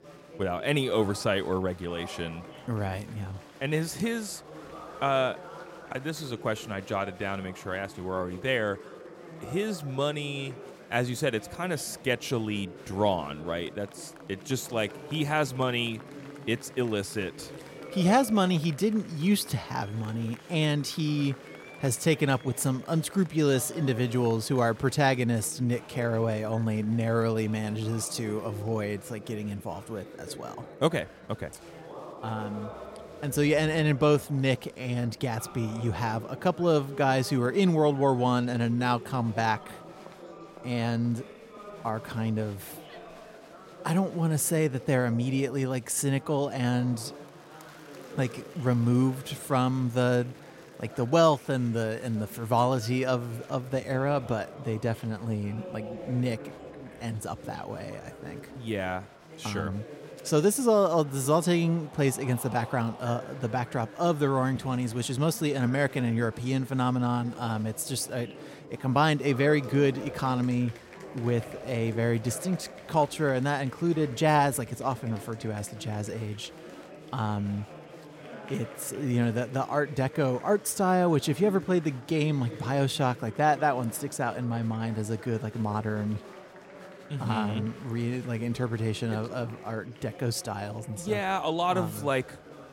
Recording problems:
chatter from many people; noticeable; throughout; 15 dB below the speech

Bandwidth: 16 kHz